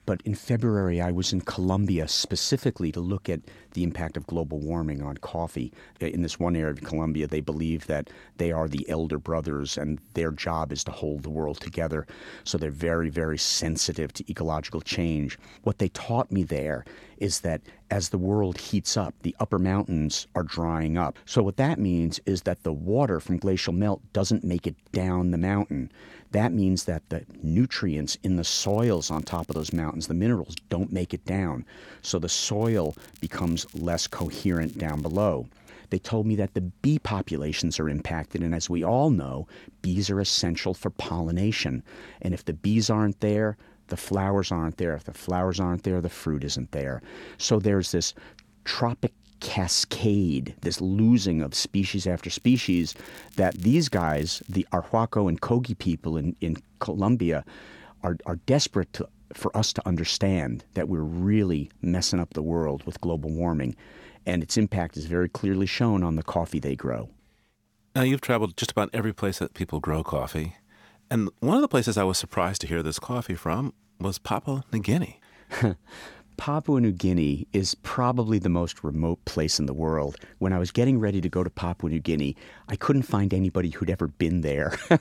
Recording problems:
crackling; faint; from 29 to 30 s, from 33 to 35 s and from 52 to 55 s; 25 dB below the speech

